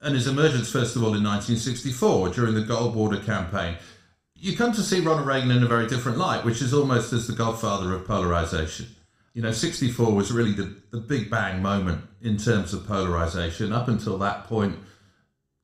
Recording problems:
room echo; slight; dies away in 0.5 s
off-mic speech; somewhat distant

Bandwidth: 15 kHz